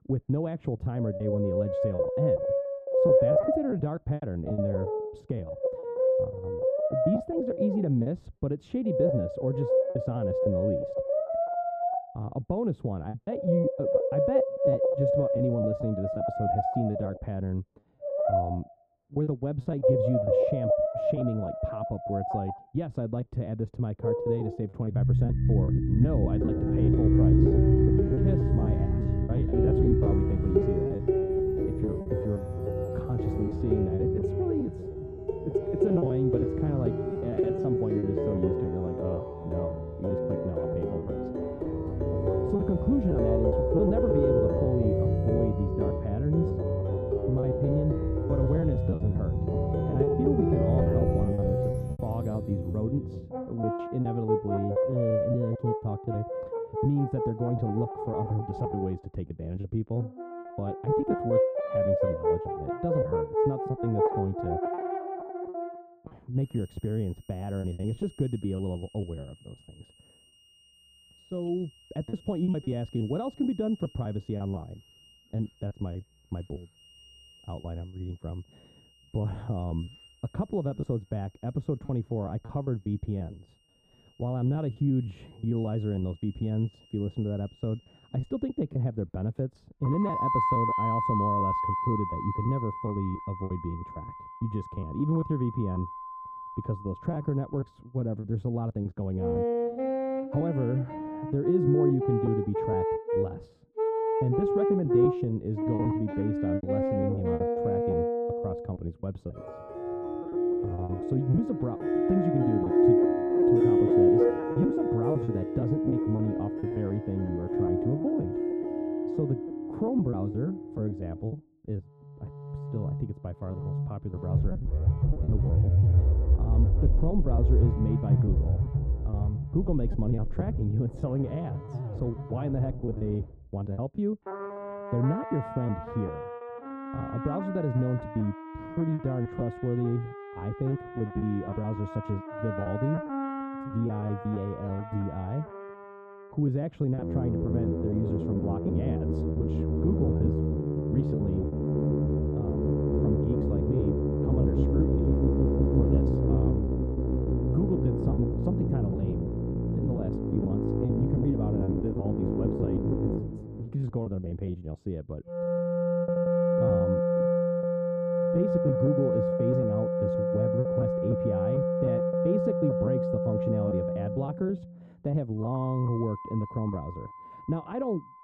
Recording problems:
muffled; very; fading above 1.5 kHz
background music; very loud; throughout; 3 dB above the speech
choppy; very; 9% of the speech affected

